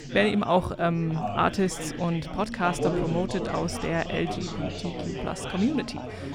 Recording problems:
chatter from many people; loud; throughout; 6 dB below the speech

